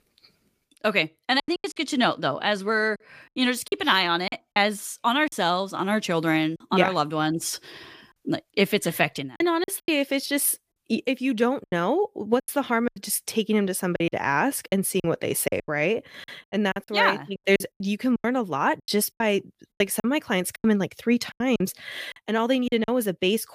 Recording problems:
choppy; very; 10% of the speech affected

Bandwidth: 15 kHz